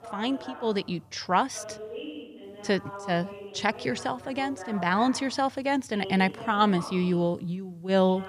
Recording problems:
voice in the background; noticeable; throughout; 15 dB below the speech

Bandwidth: 14.5 kHz